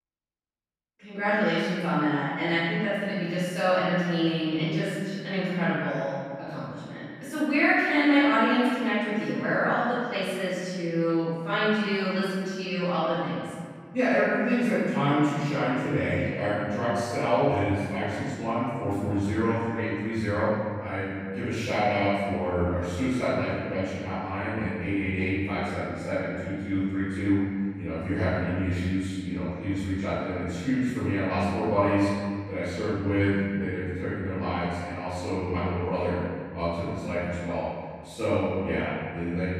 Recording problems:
room echo; strong; dies away in 1.9 s
off-mic speech; far

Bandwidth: 15.5 kHz